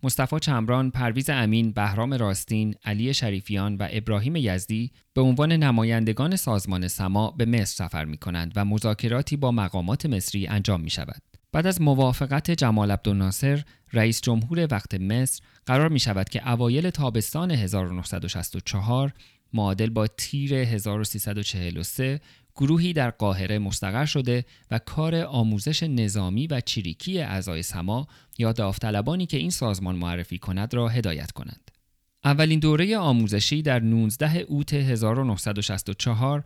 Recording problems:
none

